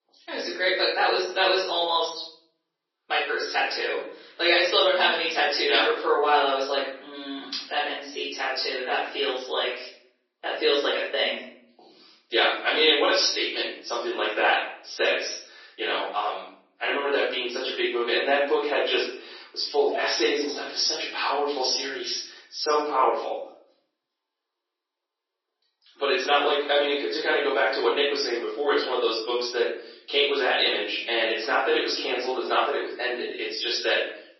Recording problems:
off-mic speech; far
room echo; noticeable; dies away in 0.7 s
thin; somewhat; fading below 350 Hz
garbled, watery; slightly; nothing above 6 kHz

